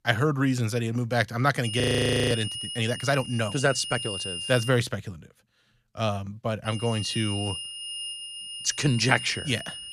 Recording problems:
high-pitched whine; loud; from 1.5 to 4.5 s and from 6.5 s on; 3 kHz, 7 dB below the speech
audio freezing; at 2 s for 0.5 s

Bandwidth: 14.5 kHz